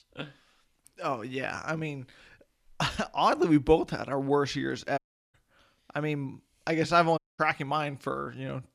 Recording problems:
audio cutting out; at 5 s and at 7 s

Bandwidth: 14.5 kHz